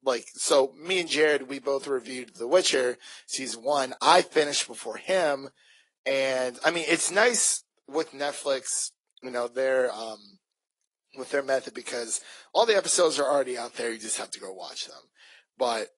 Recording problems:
thin; very; fading below 400 Hz
garbled, watery; slightly; nothing above 11 kHz

